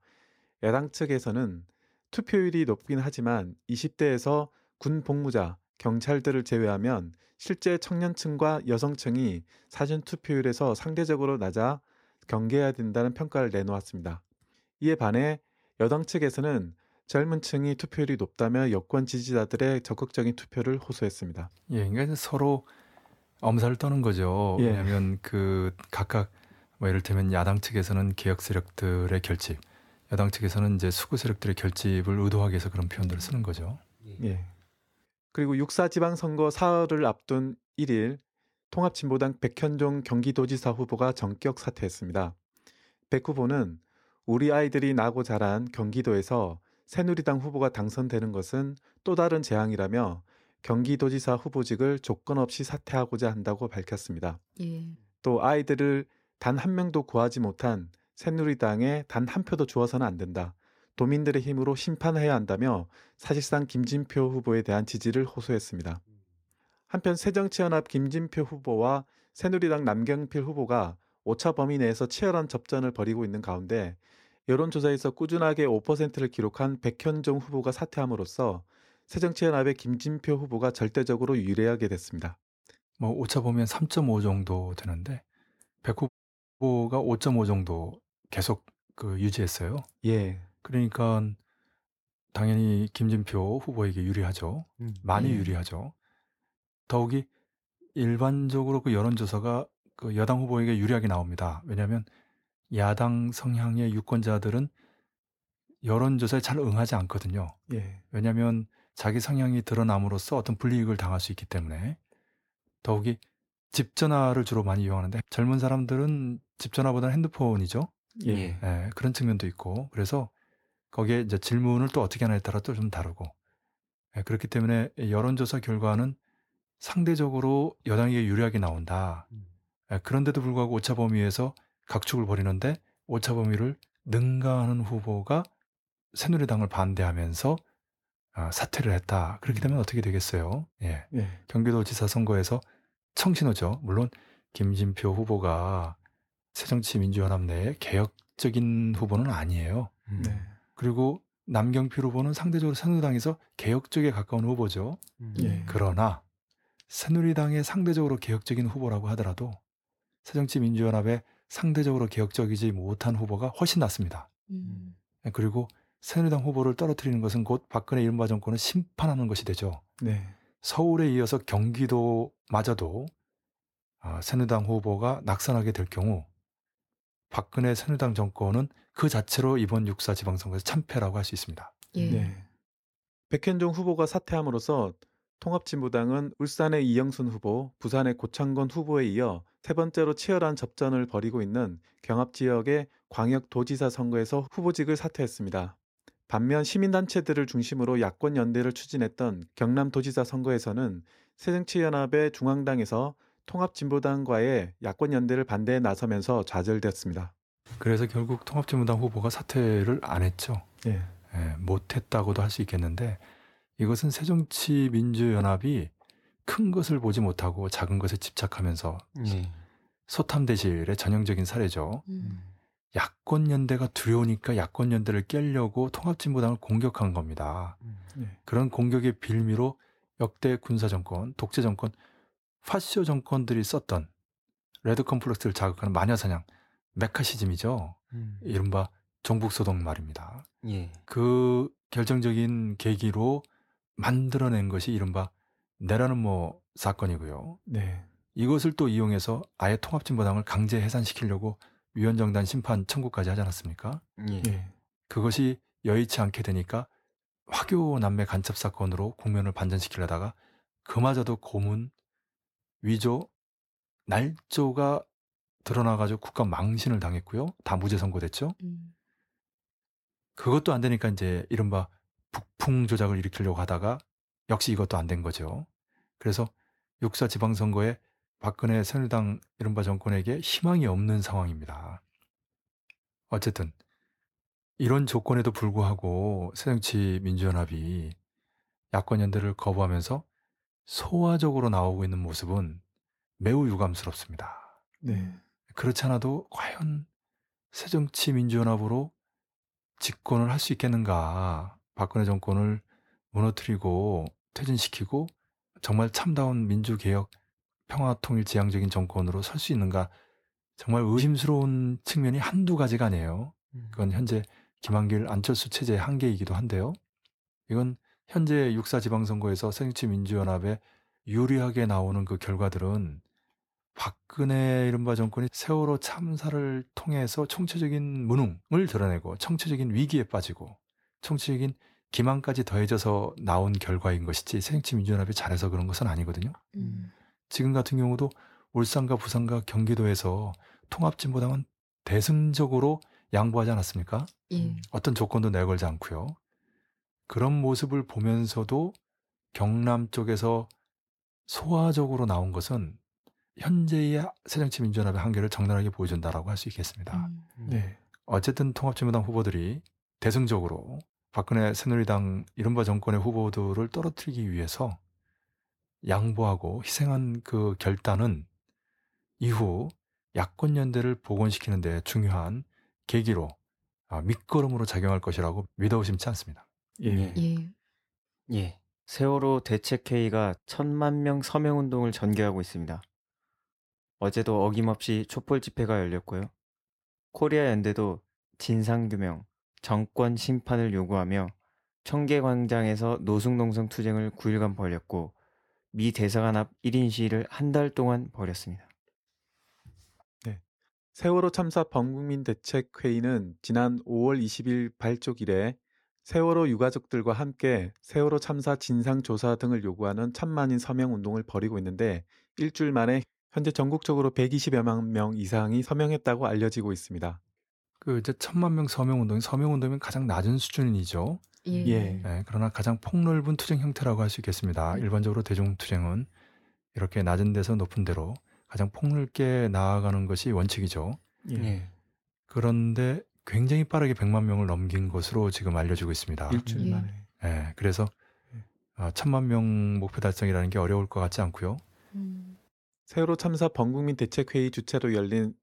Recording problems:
audio cutting out; at 1:26 for 0.5 s

